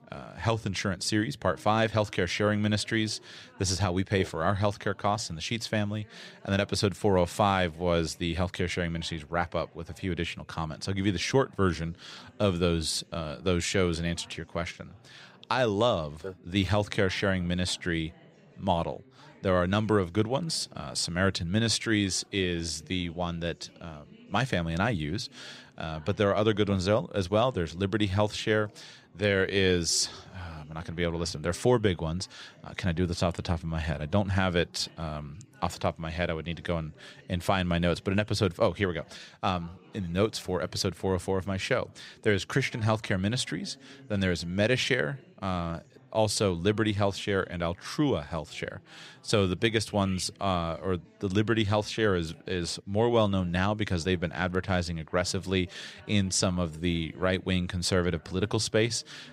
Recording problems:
background chatter; faint; throughout; 3 voices, 25 dB below the speech

